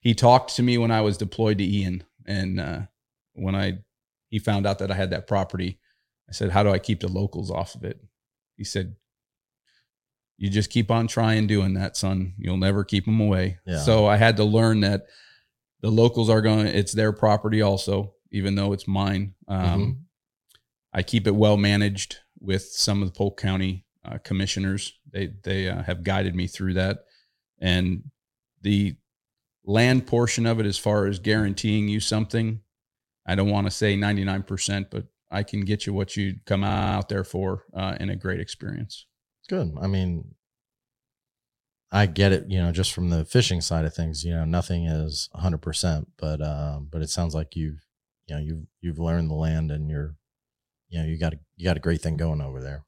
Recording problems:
audio stuttering; at 37 s

